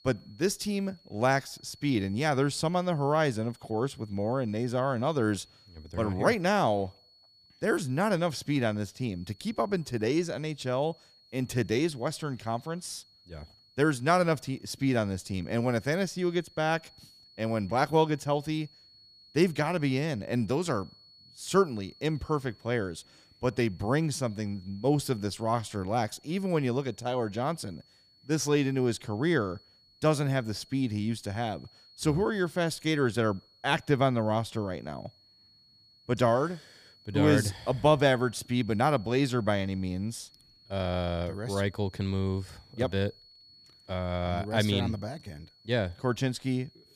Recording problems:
high-pitched whine; faint; throughout; 4.5 kHz, 30 dB below the speech

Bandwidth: 15 kHz